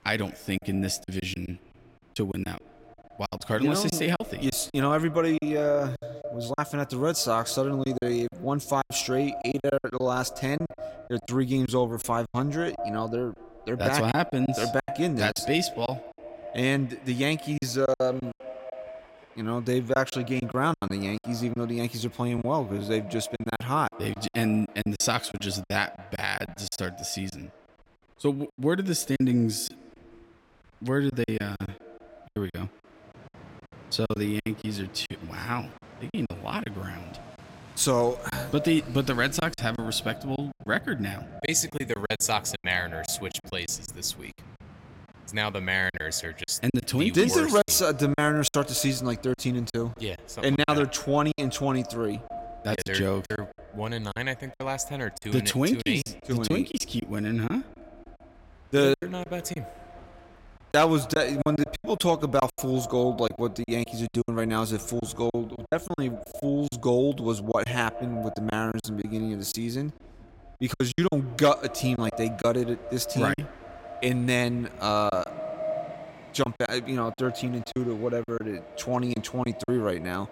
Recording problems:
echo of what is said; noticeable; throughout; 200 ms later, 15 dB below the speech
train or aircraft noise; faint; throughout; 25 dB below the speech
choppy; very; 10% of the speech affected

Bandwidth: 16 kHz